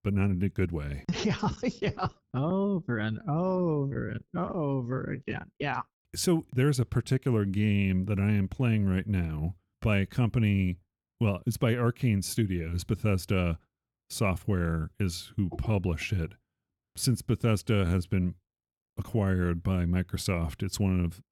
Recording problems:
uneven, jittery; slightly; from 0.5 to 20 s

